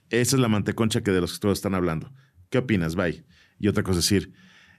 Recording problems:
none

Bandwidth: 14 kHz